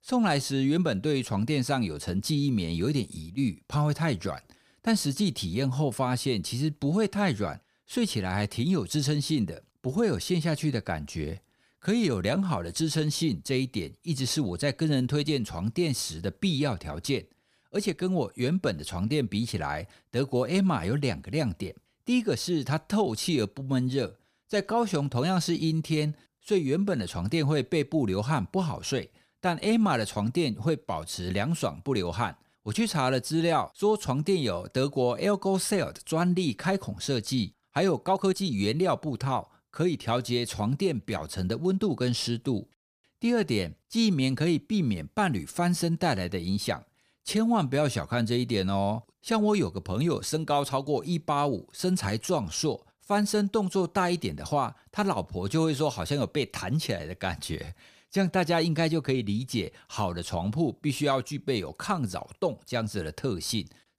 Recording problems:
uneven, jittery; slightly; from 18 to 53 s

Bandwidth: 15 kHz